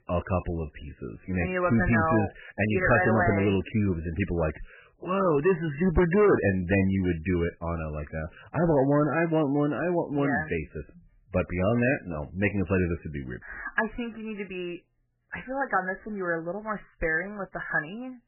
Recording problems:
garbled, watery; badly; nothing above 3 kHz
distortion; slight; 3% of the sound clipped

